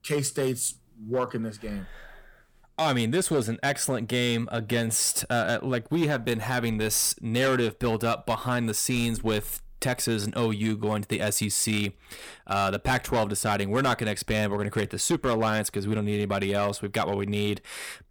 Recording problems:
distortion; slight; 6% of the sound clipped

